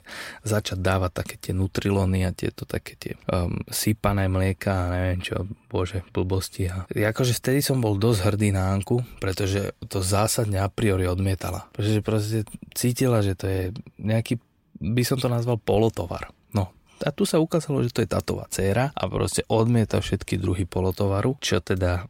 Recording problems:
none

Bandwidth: 16 kHz